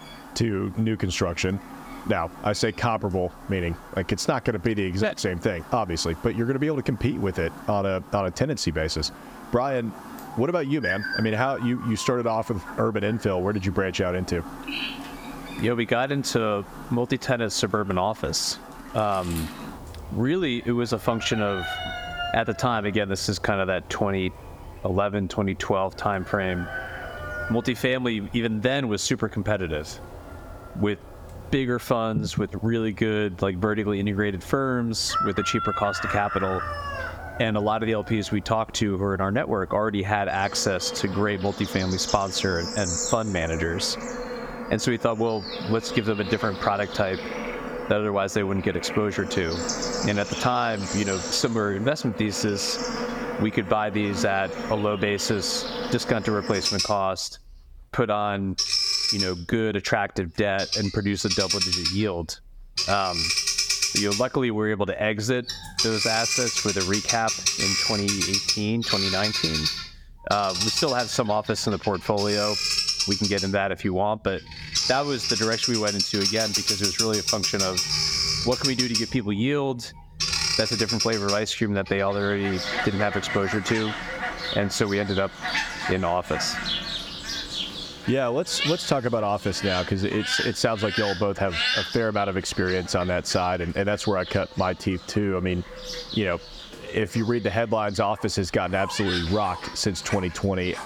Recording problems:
squashed, flat; somewhat, background pumping
animal sounds; loud; throughout; 2 dB below the speech

